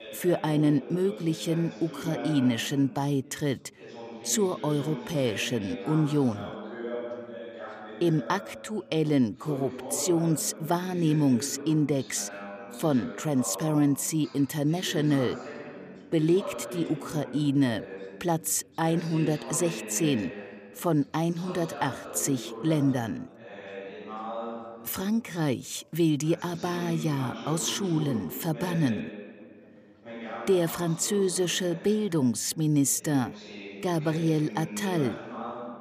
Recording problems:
background chatter; noticeable; throughout; 2 voices, 10 dB below the speech

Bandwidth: 15 kHz